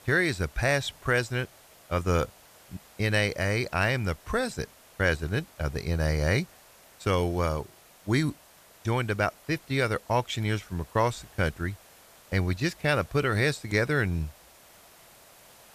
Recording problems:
hiss; faint; throughout; 25 dB below the speech

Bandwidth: 14.5 kHz